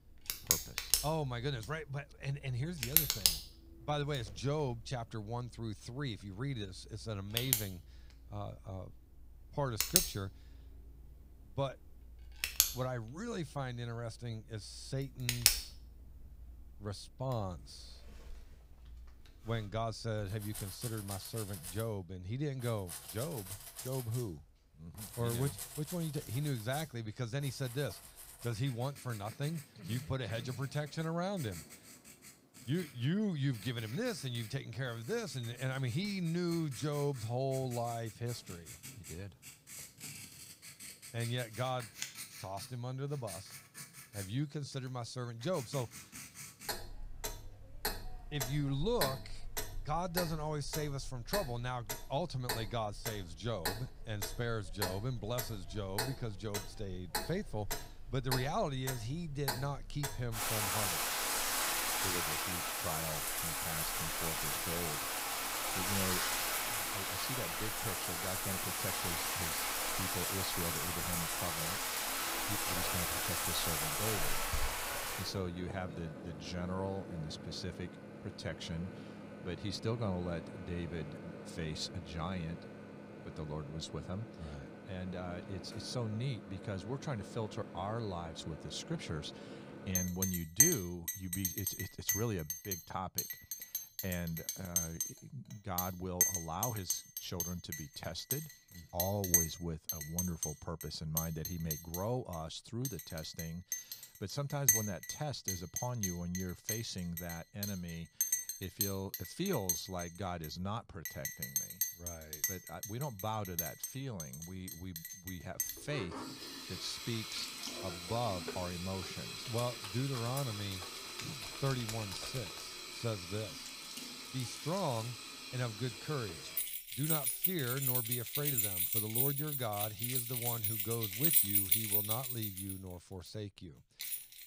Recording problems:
household noises; very loud; throughout; 4 dB above the speech

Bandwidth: 15.5 kHz